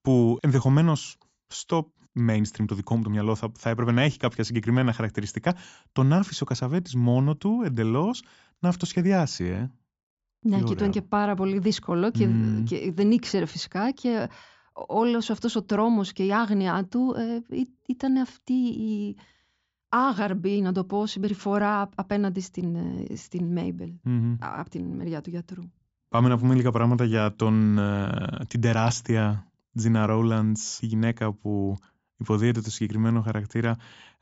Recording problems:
high frequencies cut off; noticeable; nothing above 8 kHz

